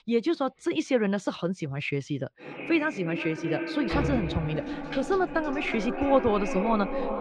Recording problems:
echo of what is said; strong; from 2.5 s on; 360 ms later, 6 dB below the speech
muffled; slightly; fading above 3.5 kHz
household noises; loud; throughout; 9 dB below the speech

